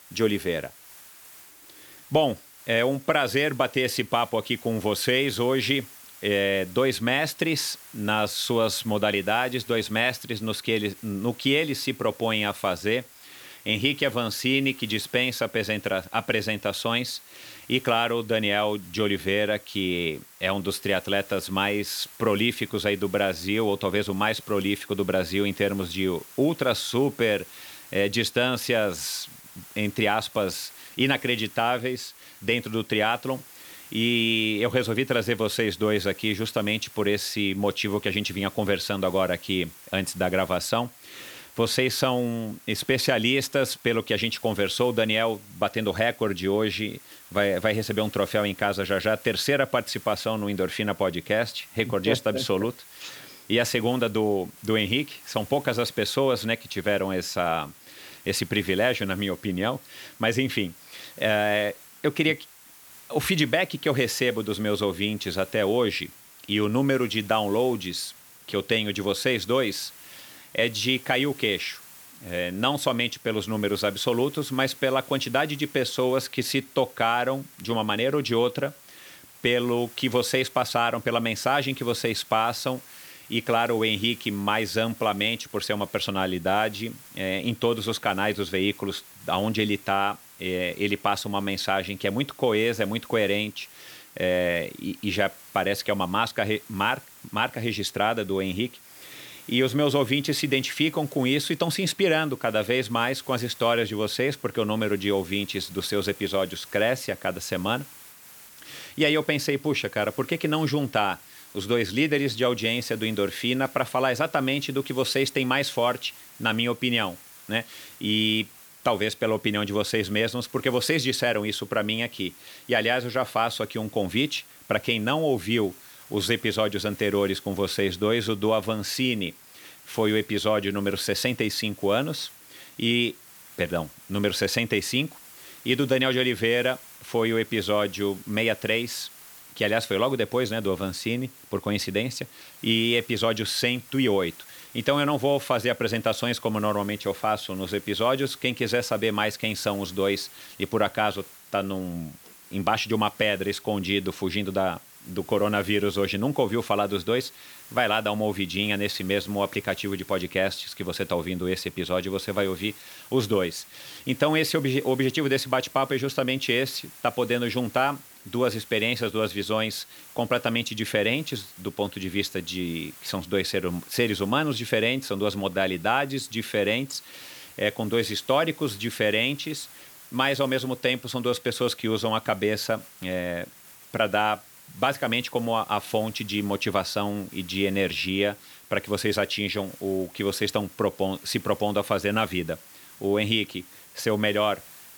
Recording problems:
hiss; noticeable; throughout; 20 dB below the speech

